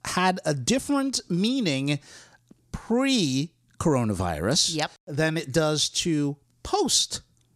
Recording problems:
none

